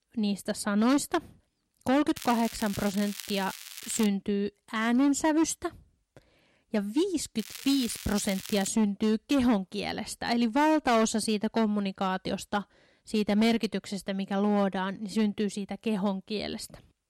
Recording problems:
distortion; slight; 5% of the sound clipped
crackling; noticeable; from 2 to 4 s and from 7.5 to 8.5 s; 10 dB below the speech

